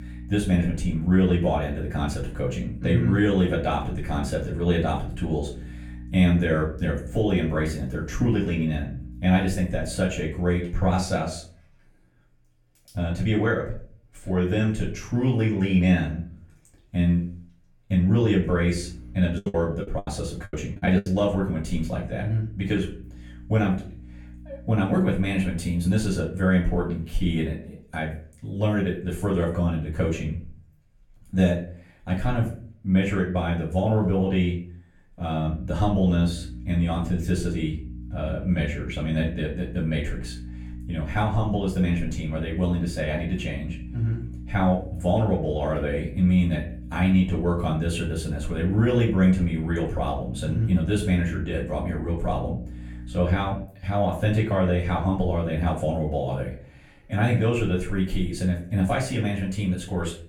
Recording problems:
off-mic speech; far
room echo; slight; dies away in 0.4 s
electrical hum; faint; until 11 s, from 18 to 26 s and from 36 to 54 s; 60 Hz, 20 dB below the speech
choppy; very; from 19 to 21 s; 27% of the speech affected

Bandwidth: 17 kHz